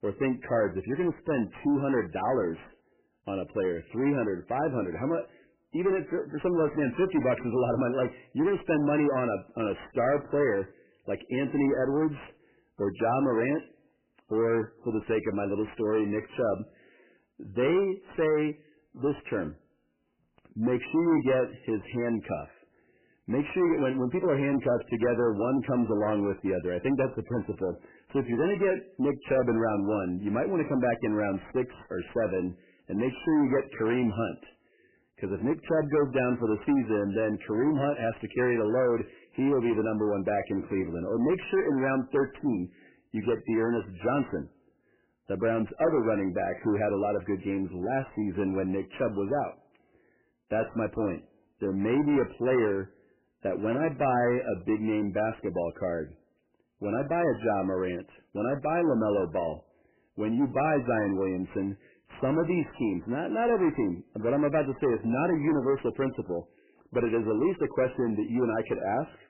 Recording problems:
garbled, watery; badly; nothing above 3 kHz
distortion; slight; 10 dB below the speech

